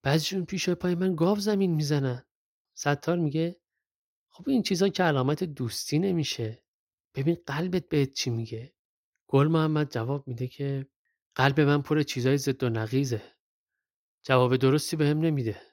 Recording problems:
none

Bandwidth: 16 kHz